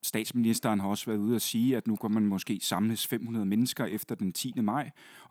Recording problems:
none

